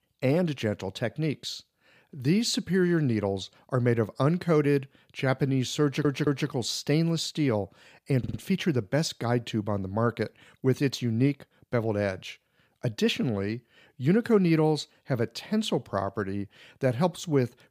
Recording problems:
audio stuttering; at 6 s and at 8 s

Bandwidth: 15 kHz